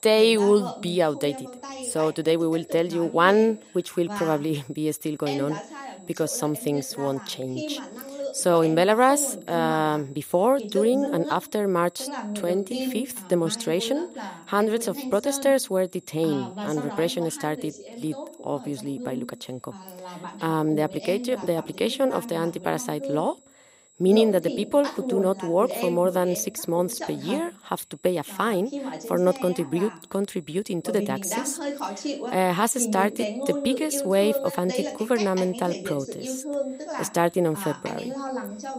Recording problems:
voice in the background; loud; throughout; 10 dB below the speech
high-pitched whine; faint; throughout; 8 kHz, 30 dB below the speech

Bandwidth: 15.5 kHz